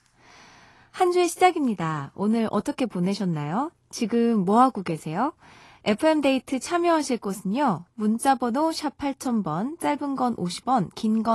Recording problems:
garbled, watery; slightly; nothing above 11.5 kHz
abrupt cut into speech; at the end

